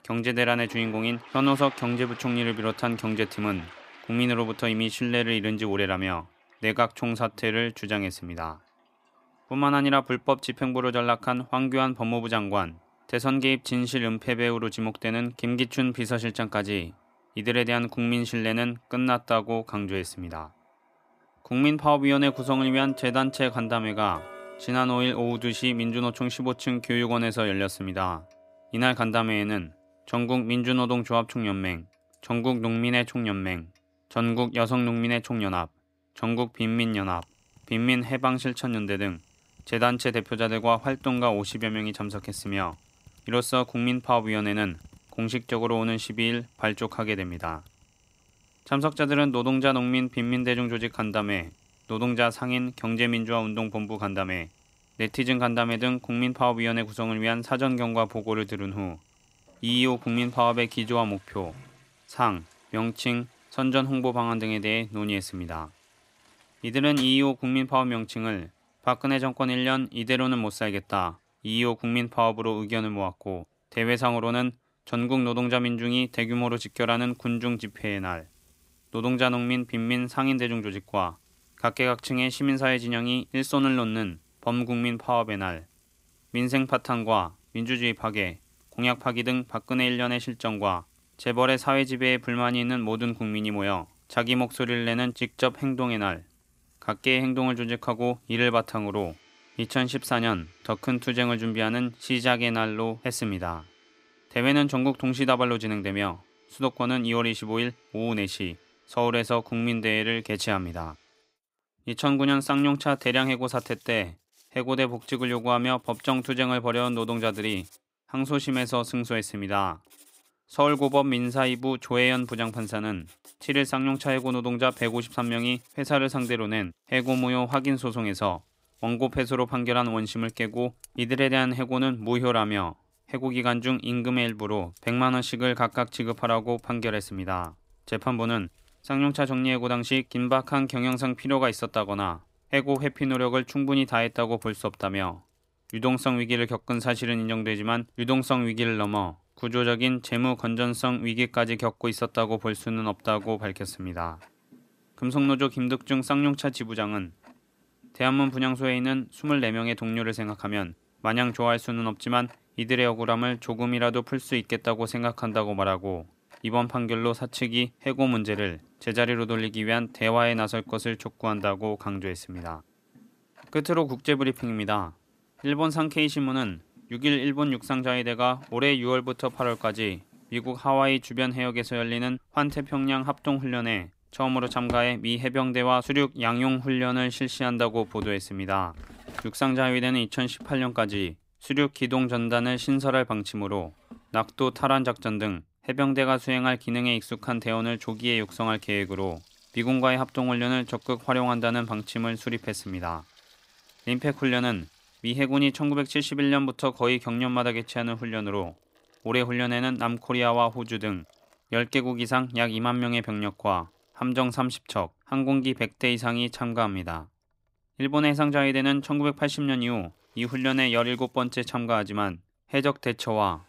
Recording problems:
household noises; faint; throughout; 25 dB below the speech

